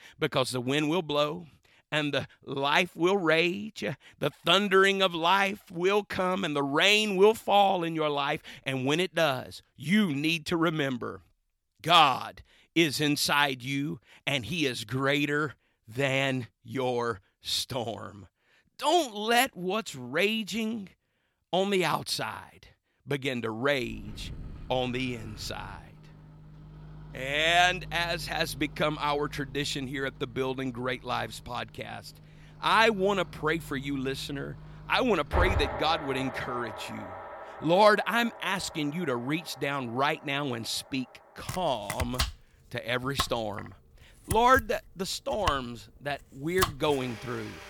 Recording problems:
household noises; noticeable; from 24 s on; 10 dB below the speech

